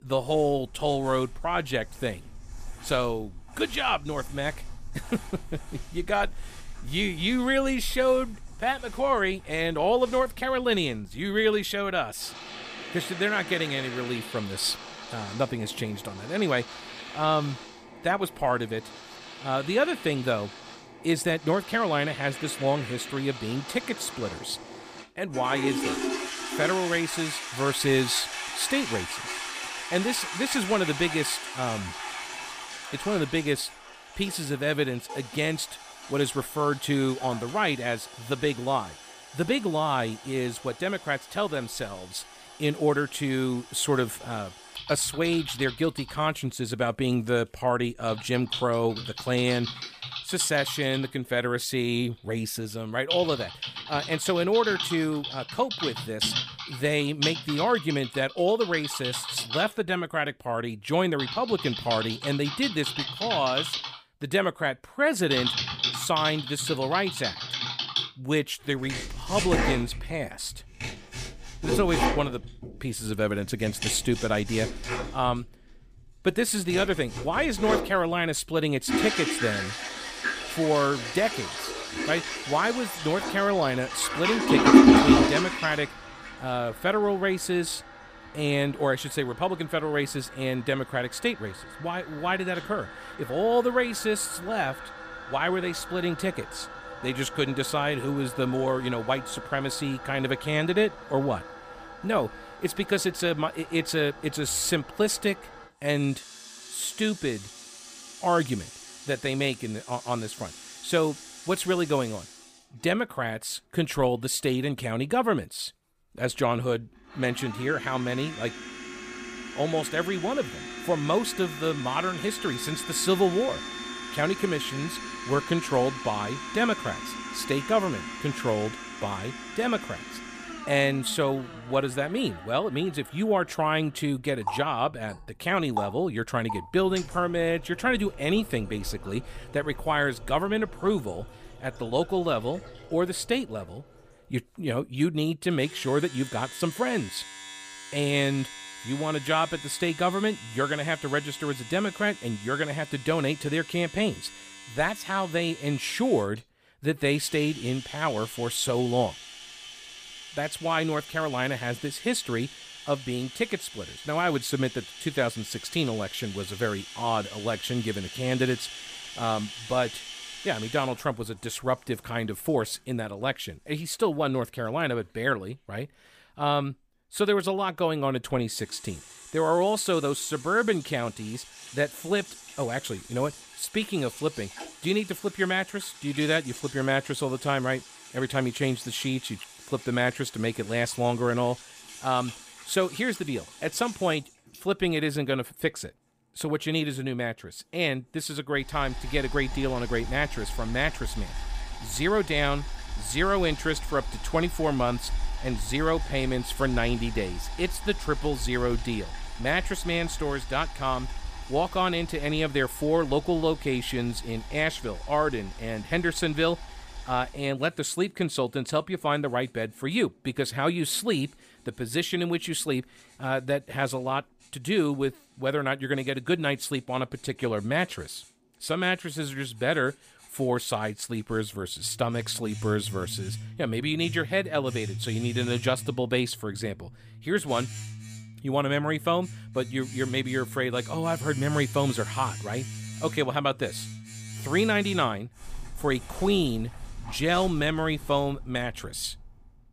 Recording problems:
household noises; loud; throughout; 6 dB below the speech

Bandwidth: 15 kHz